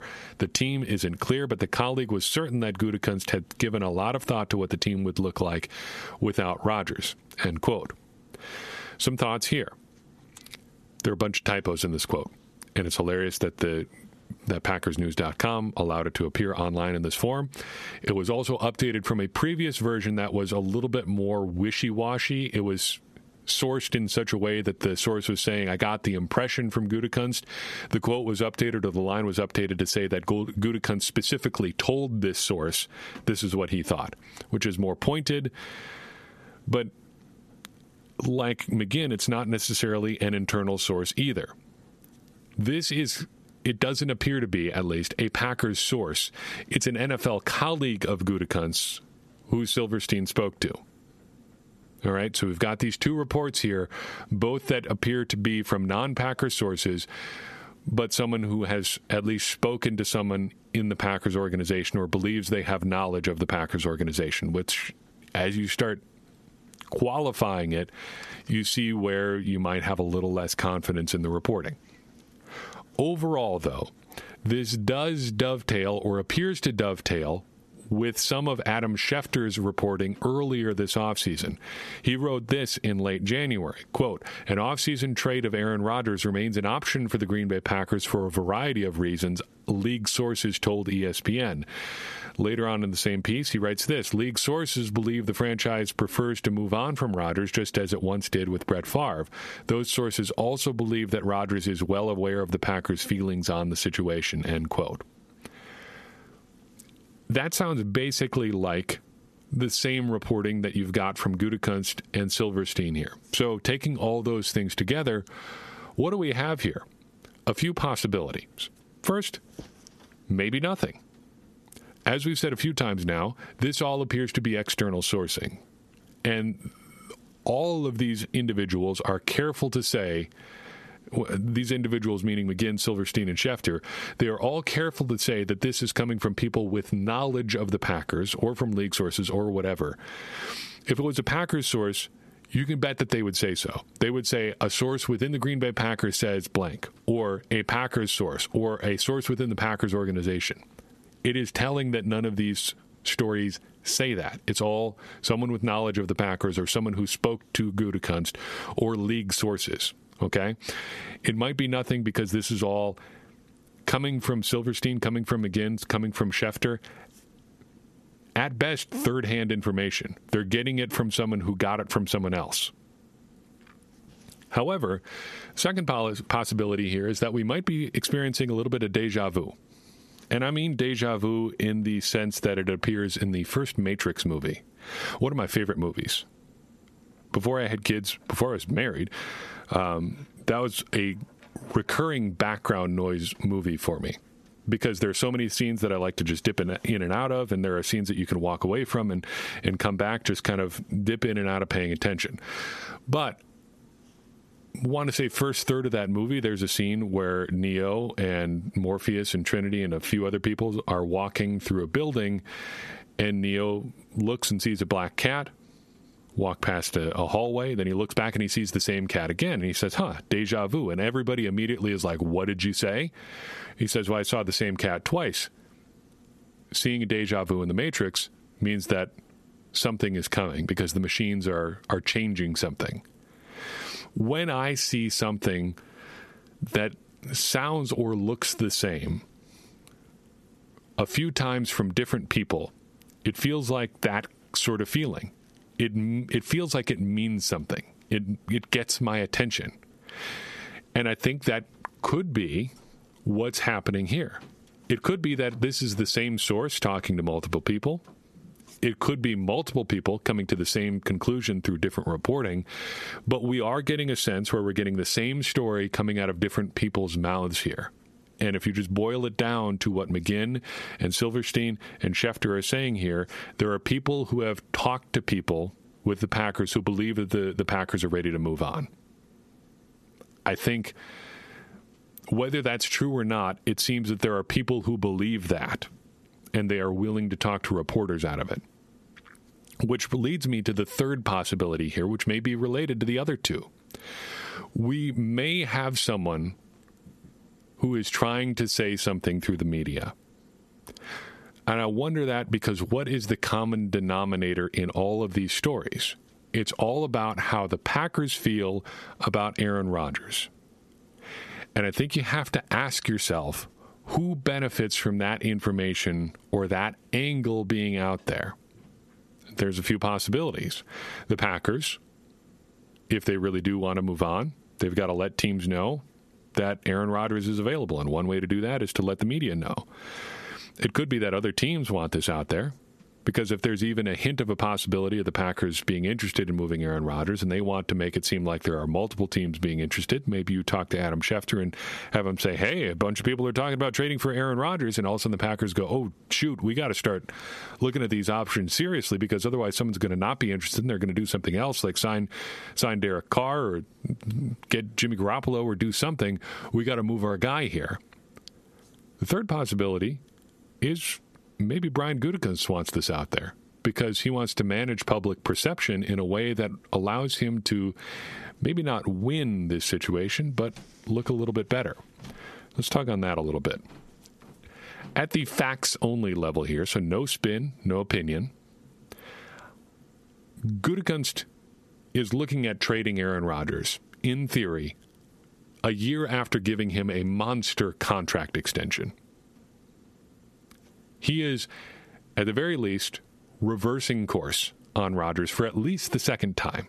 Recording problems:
squashed, flat; heavily

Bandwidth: 13.5 kHz